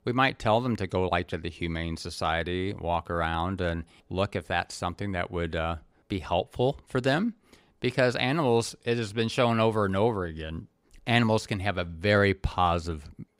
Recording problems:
none

